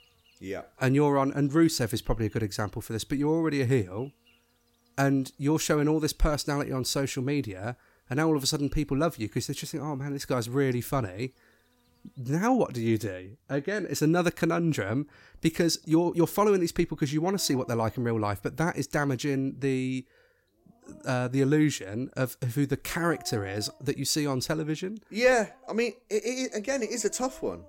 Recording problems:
animal sounds; faint; throughout; 30 dB below the speech

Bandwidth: 16.5 kHz